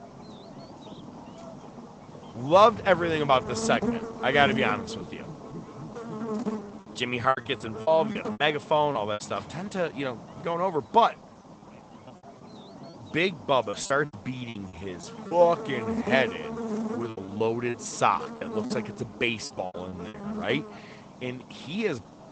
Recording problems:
high frequencies cut off; noticeable; nothing above 8 kHz
garbled, watery; slightly
electrical hum; noticeable; throughout; 50 Hz, 15 dB below the speech
rain or running water; faint; throughout; 20 dB below the speech
choppy; very; from 7 to 9 s, from 11 to 15 s and from 17 to 21 s; 15% of the speech affected

